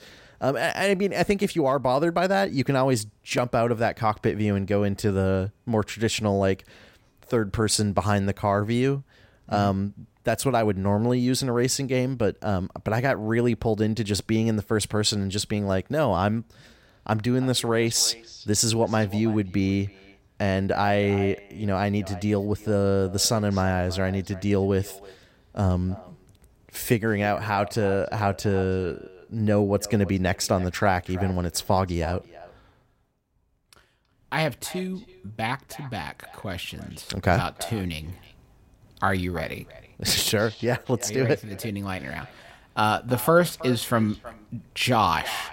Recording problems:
echo of what is said; faint; from 17 s on; 320 ms later, 20 dB below the speech

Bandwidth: 16 kHz